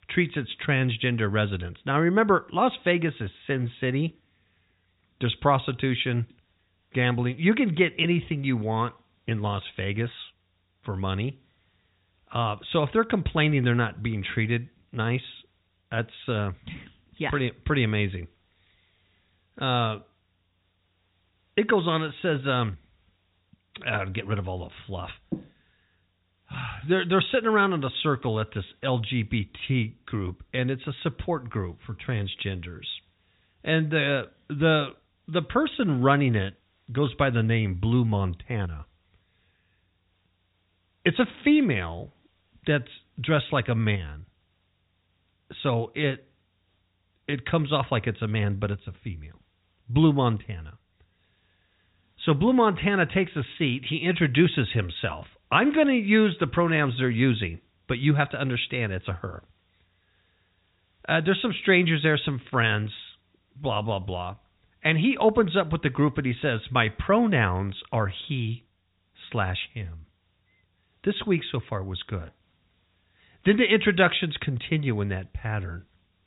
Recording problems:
high frequencies cut off; severe; nothing above 4 kHz
hiss; very faint; throughout; 45 dB below the speech

